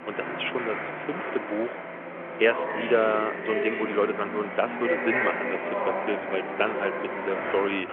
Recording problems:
phone-call audio
traffic noise; loud; throughout; 2 dB below the speech

